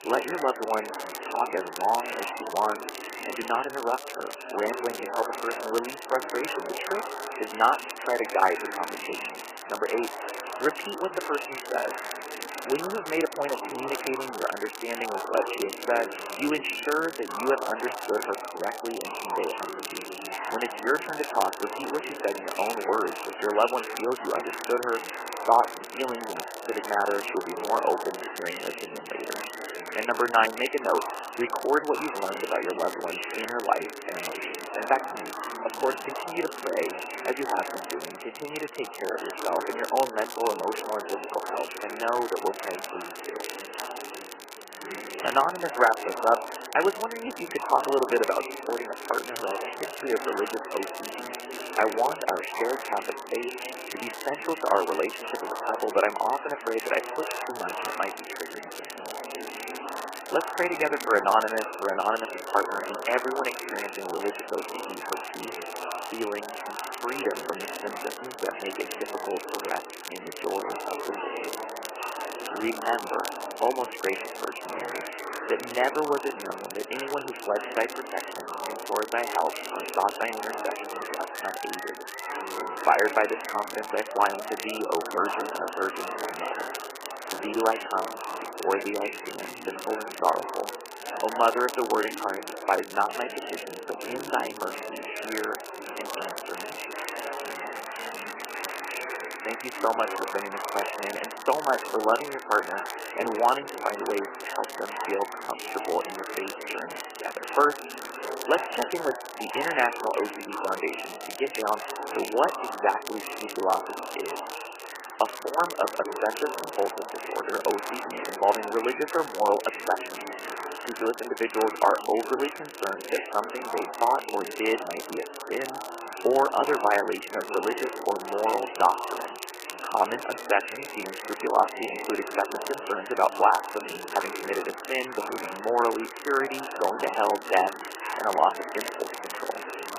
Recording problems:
garbled, watery; badly; nothing above 3 kHz
thin; very; fading below 350 Hz
murmuring crowd; loud; throughout; 7 dB below the speech
crackle, like an old record; noticeable; 15 dB below the speech

